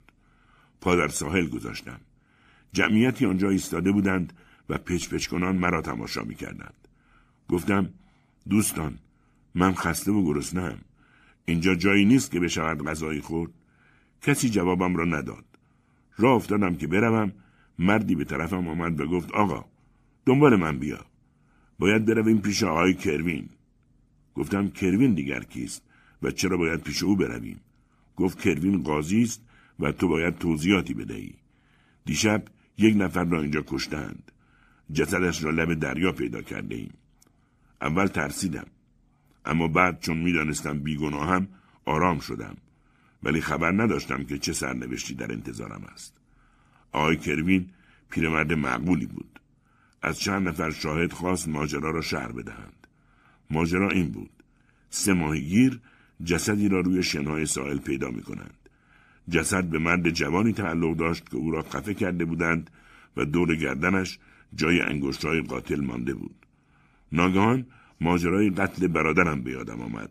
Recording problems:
none

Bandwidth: 14.5 kHz